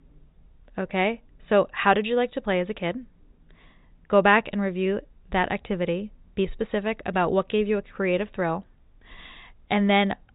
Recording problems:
high frequencies cut off; severe; nothing above 4 kHz

